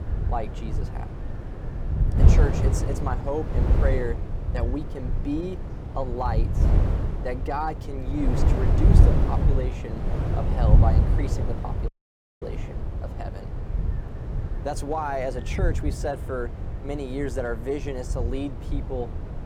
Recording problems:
wind noise on the microphone; heavy; 5 dB below the speech
background chatter; faint; throughout; 4 voices, 30 dB below the speech
audio cutting out; at 12 s for 0.5 s

